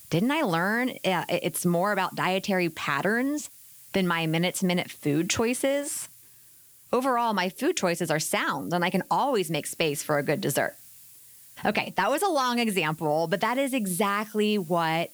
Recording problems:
hiss; faint; throughout; 20 dB below the speech

